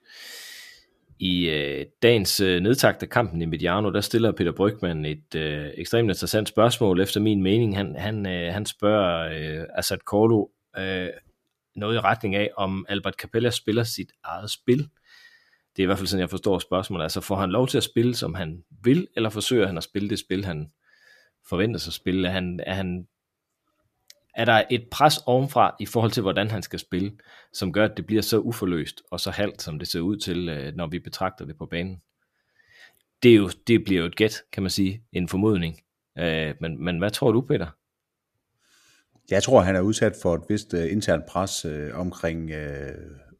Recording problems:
none

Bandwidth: 14.5 kHz